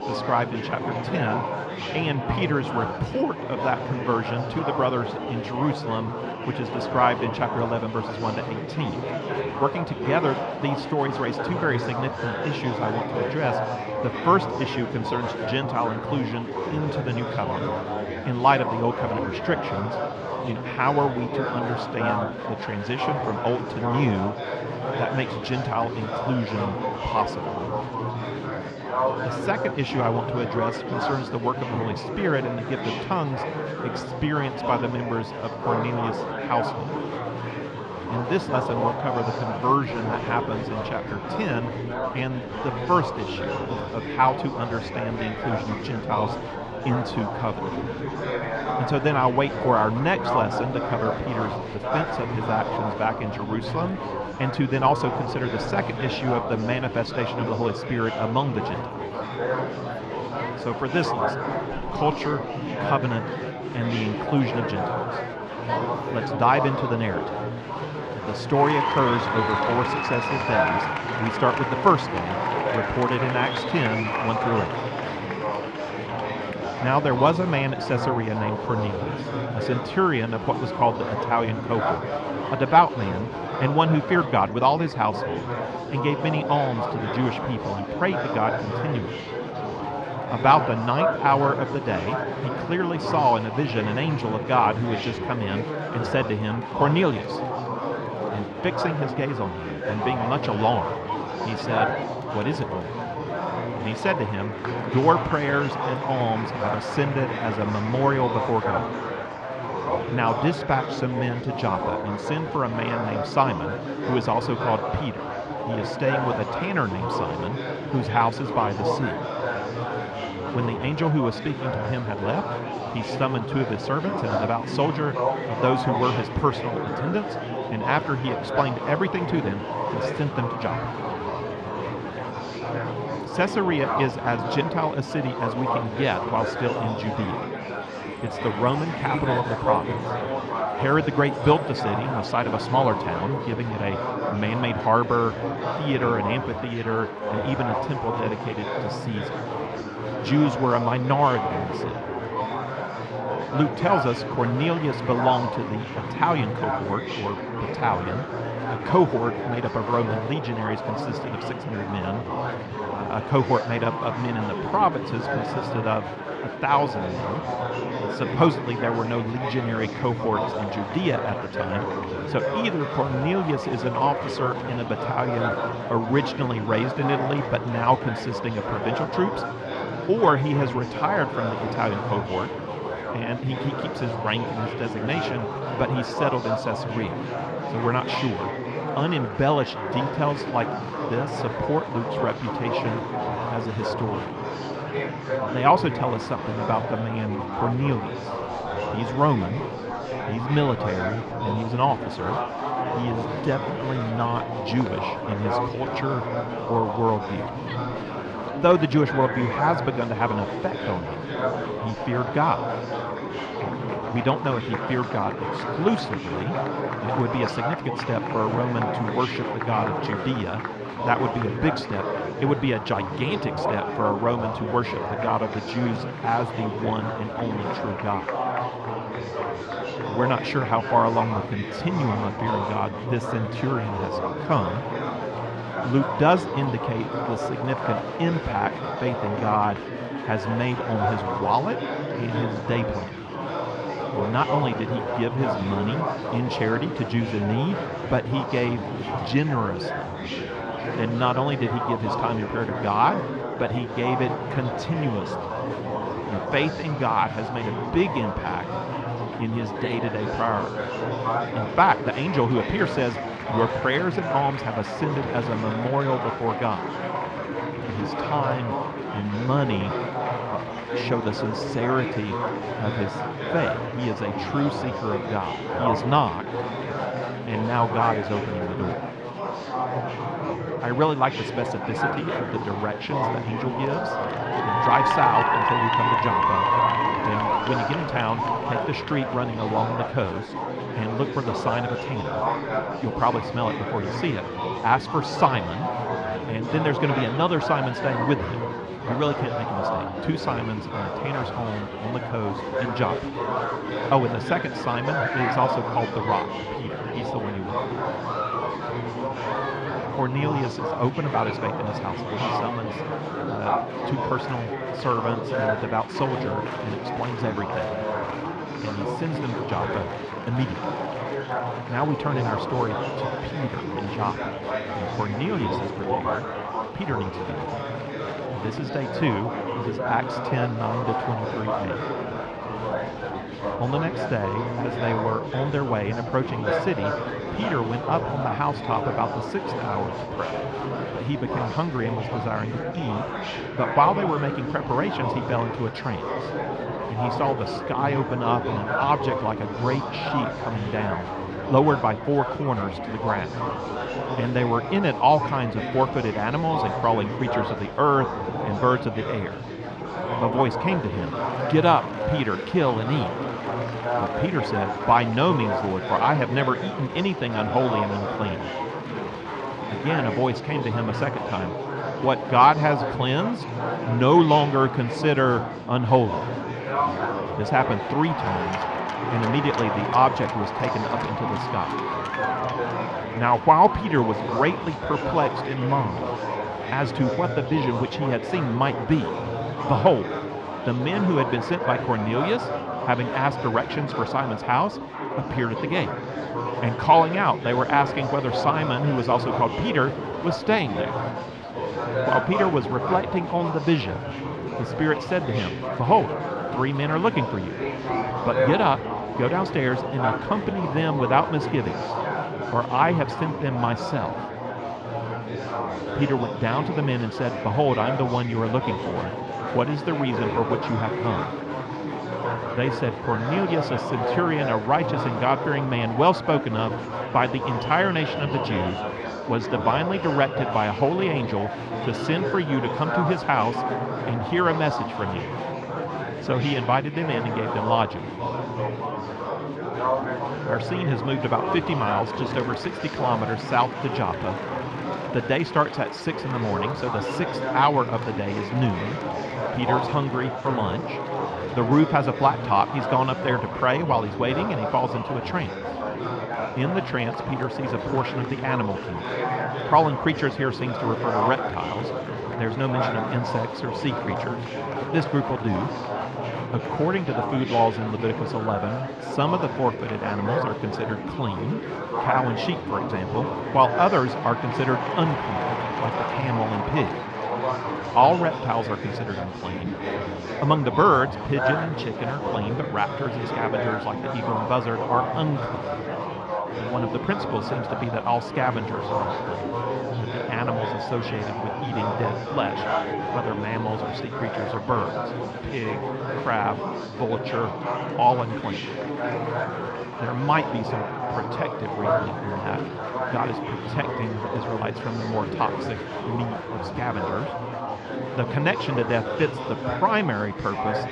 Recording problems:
muffled; slightly; fading above 3.5 kHz
murmuring crowd; loud; throughout; 3 dB below the speech

